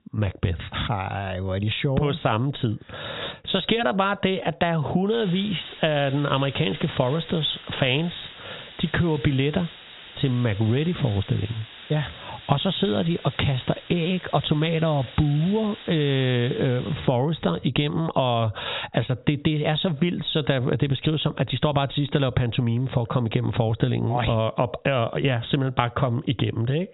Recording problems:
high frequencies cut off; severe; nothing above 4 kHz
squashed, flat; heavily
hiss; noticeable; from 5 to 17 s; 15 dB below the speech

